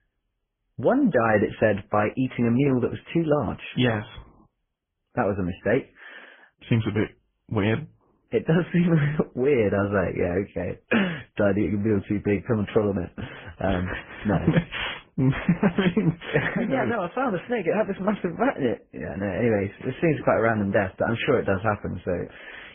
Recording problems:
garbled, watery; badly
high frequencies cut off; severe; nothing above 3.5 kHz

